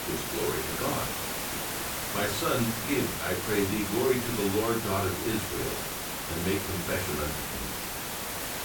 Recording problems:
off-mic speech; far
room echo; slight; dies away in 0.3 s
hiss; loud; throughout; 1 dB below the speech

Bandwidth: 18 kHz